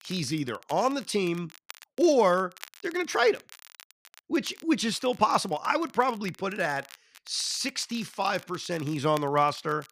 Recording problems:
crackle, like an old record; faint; 20 dB below the speech

